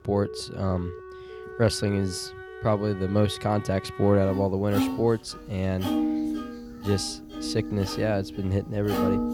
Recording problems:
background music; loud; throughout; 7 dB below the speech
alarms or sirens; noticeable; throughout; 20 dB below the speech

